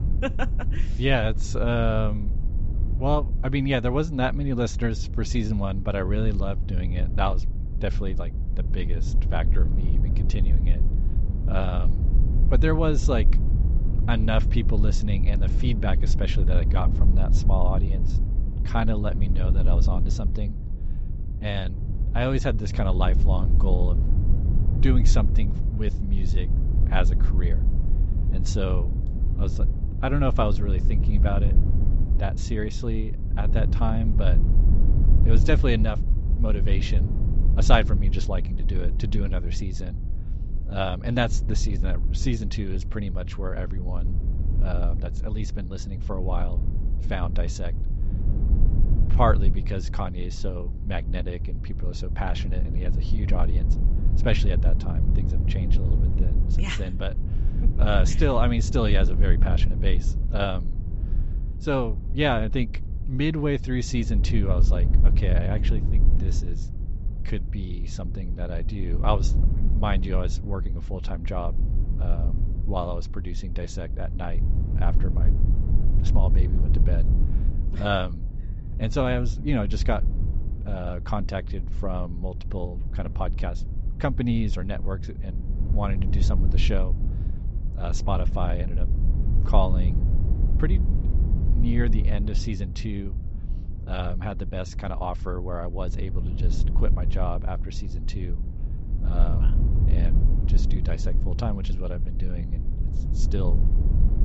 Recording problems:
high frequencies cut off; noticeable; nothing above 7.5 kHz
low rumble; noticeable; throughout; 10 dB below the speech

